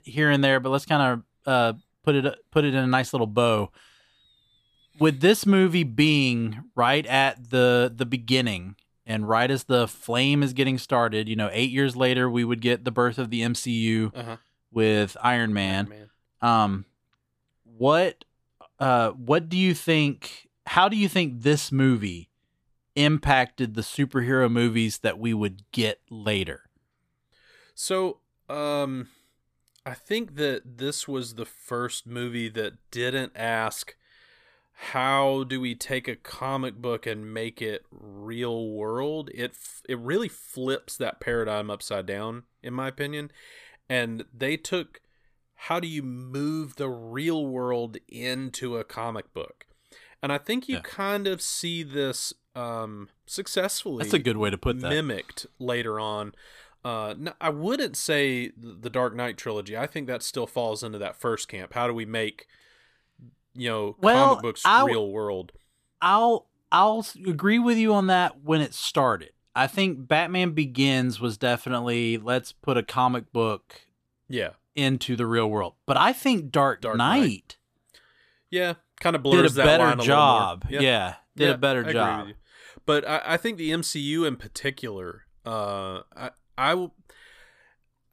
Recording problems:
none

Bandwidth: 14.5 kHz